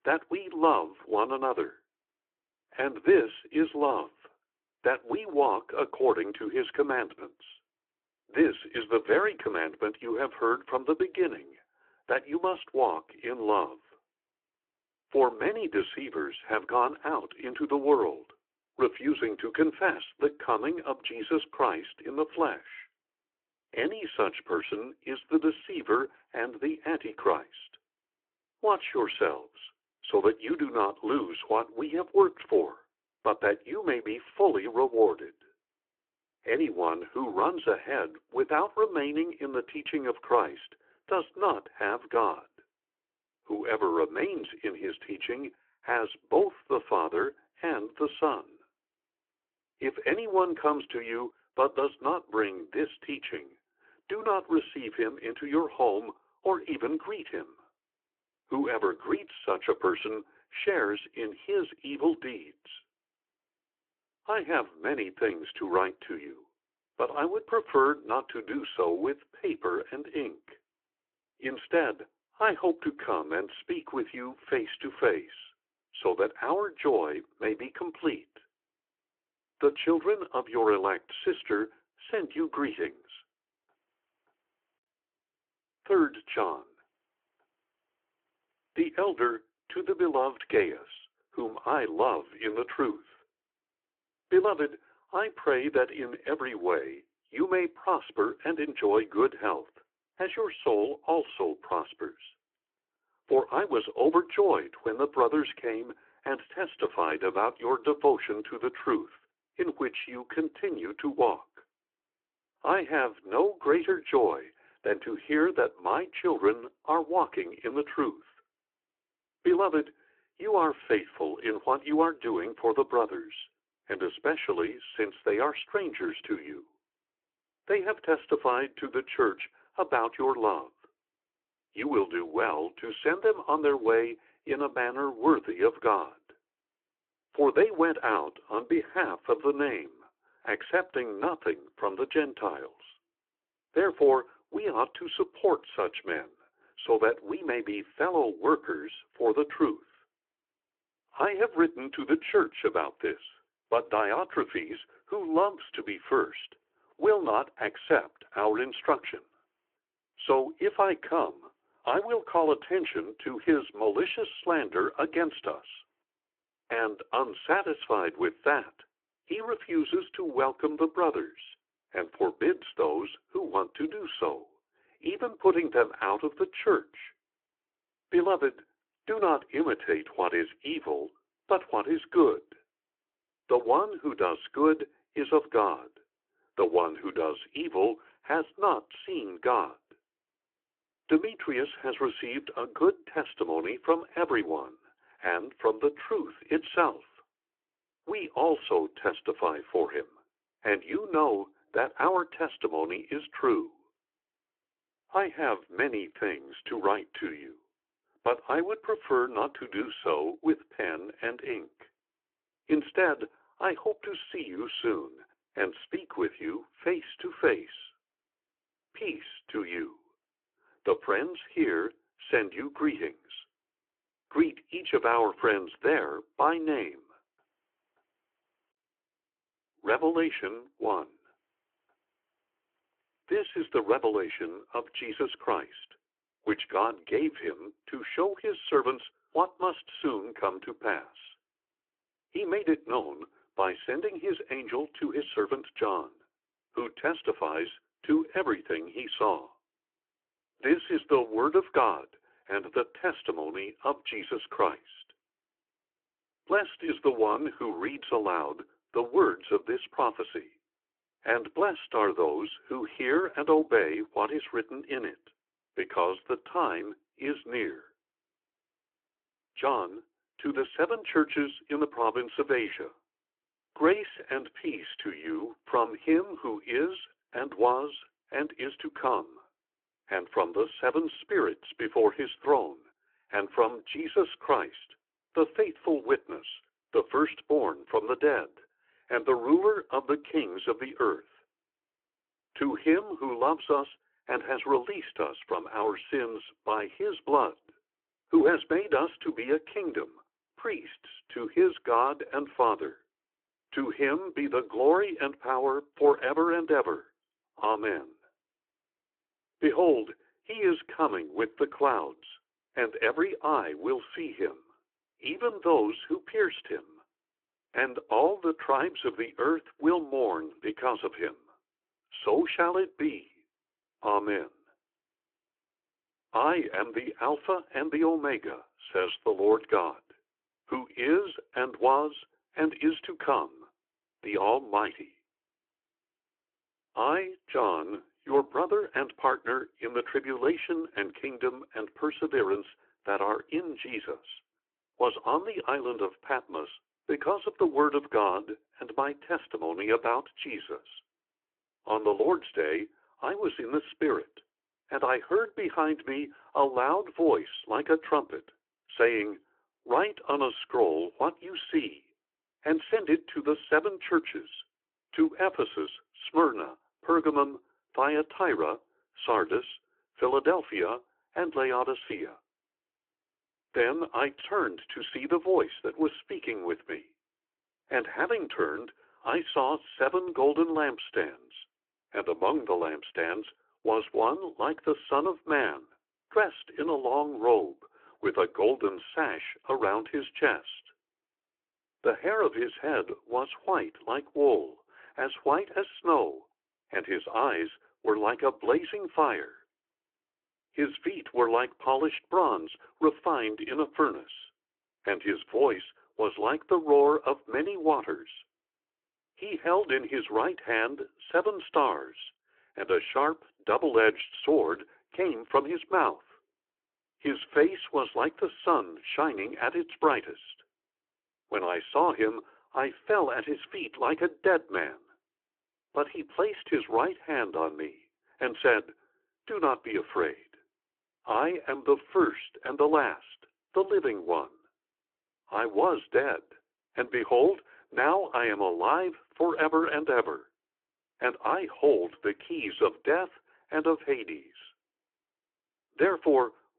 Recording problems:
phone-call audio

